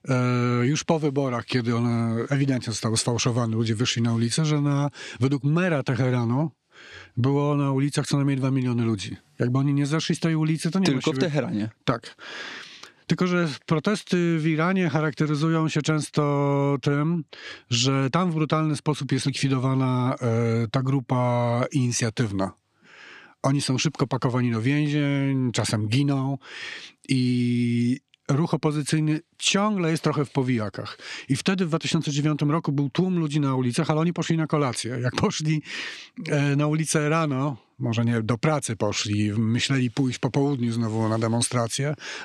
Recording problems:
squashed, flat; somewhat

